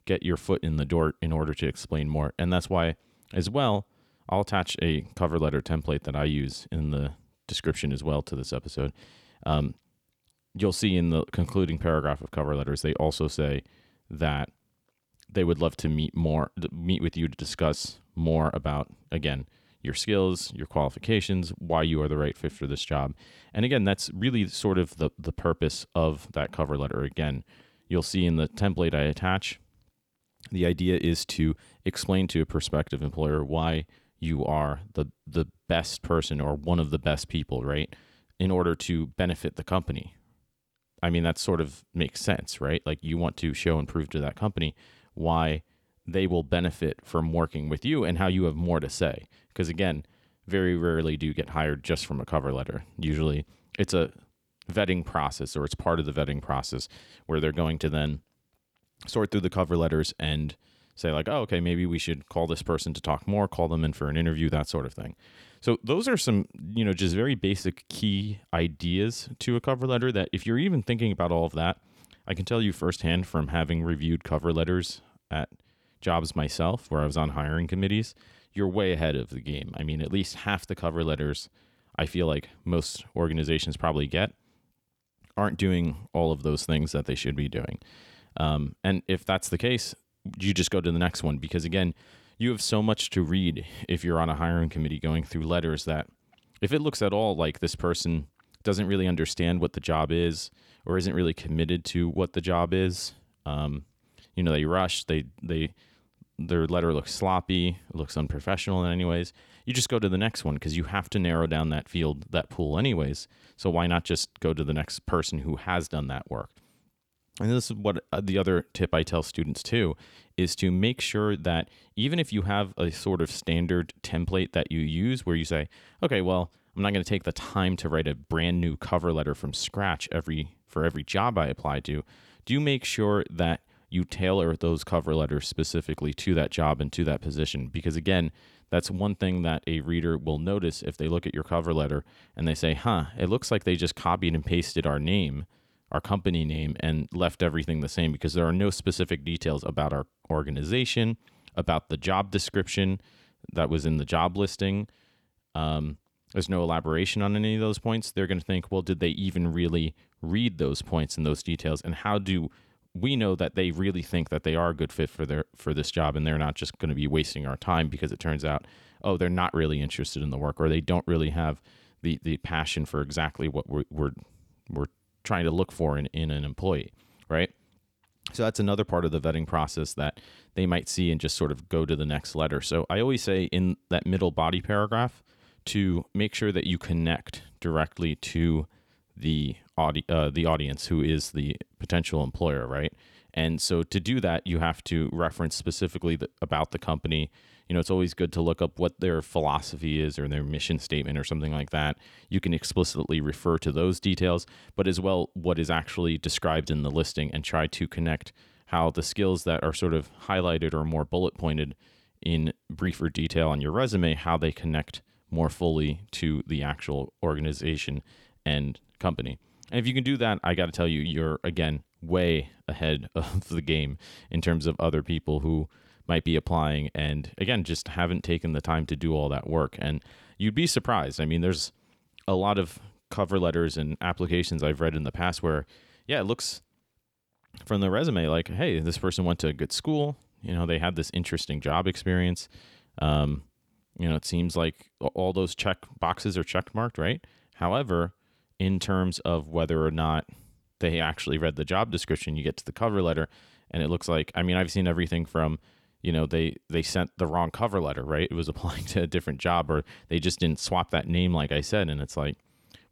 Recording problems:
none

